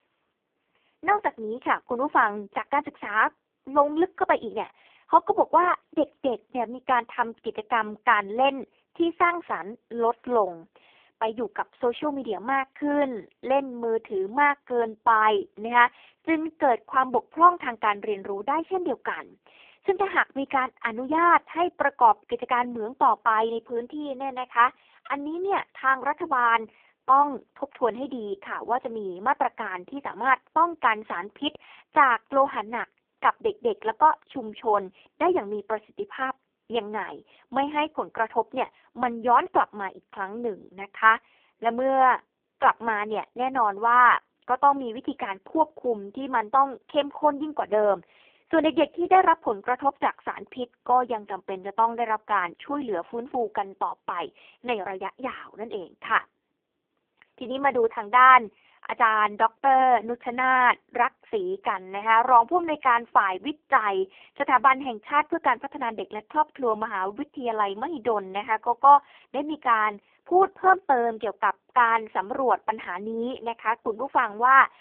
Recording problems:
phone-call audio; poor line

